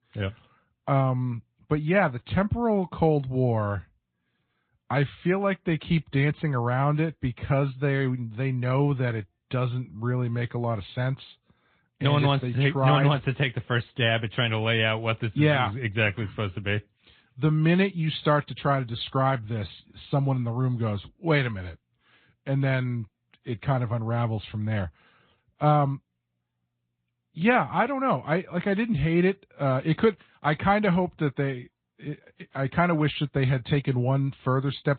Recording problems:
high frequencies cut off; severe; nothing above 4 kHz
garbled, watery; slightly

